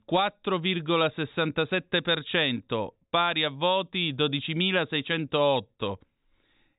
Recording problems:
high frequencies cut off; severe; nothing above 4 kHz

